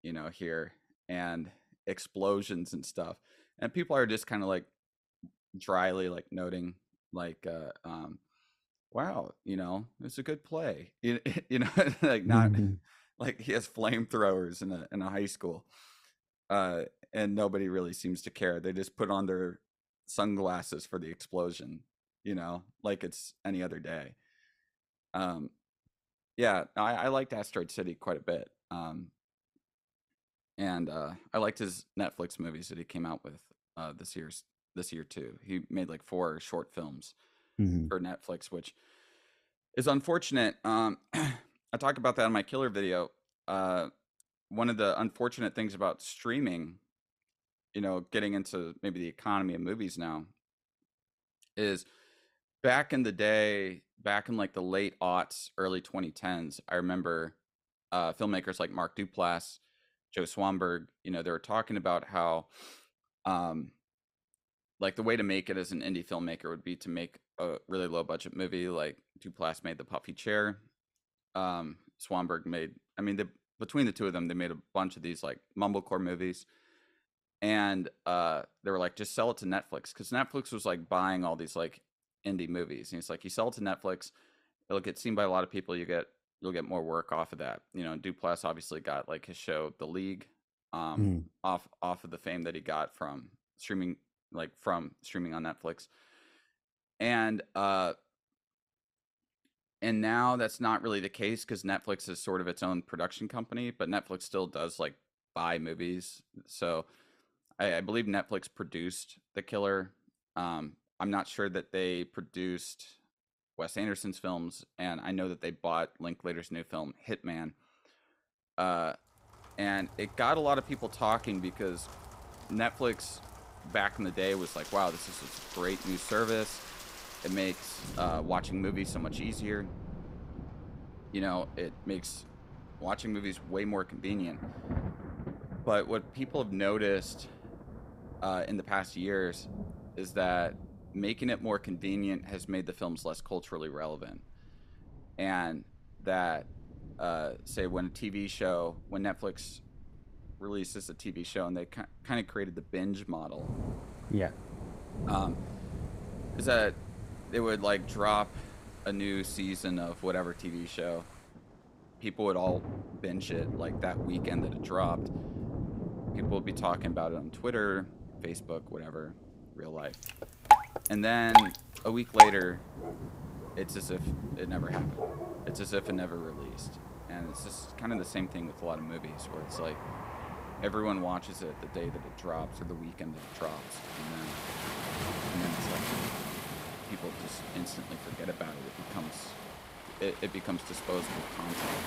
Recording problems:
rain or running water; loud; from 2:00 on; 1 dB below the speech

